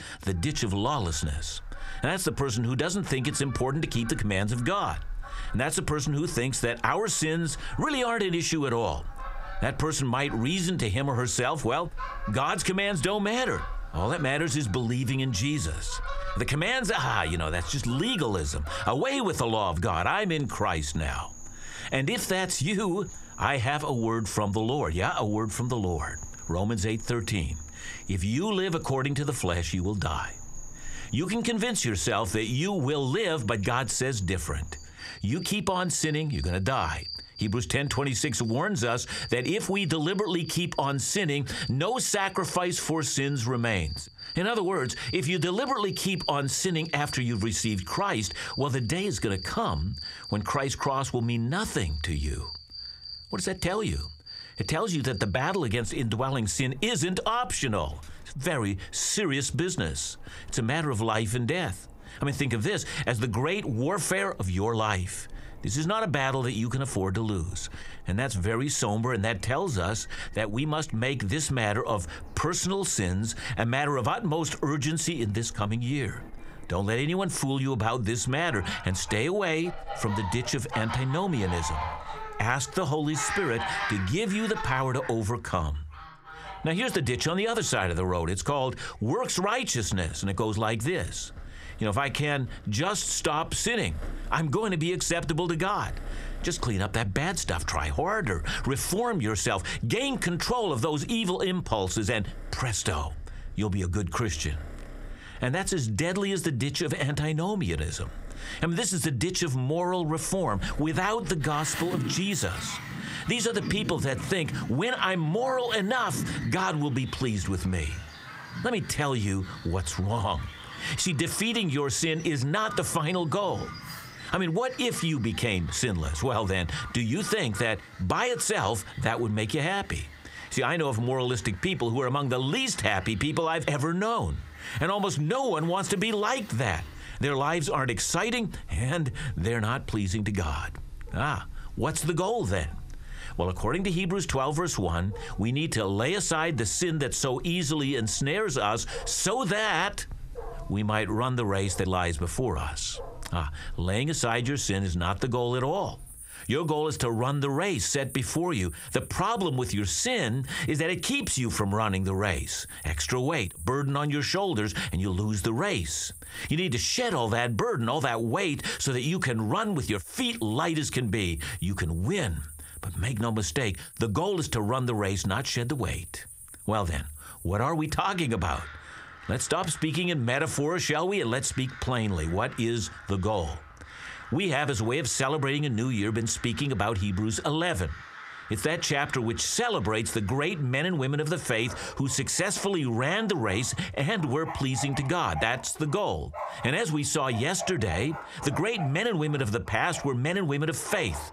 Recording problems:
squashed, flat; heavily, background pumping
animal sounds; noticeable; throughout; 15 dB below the speech

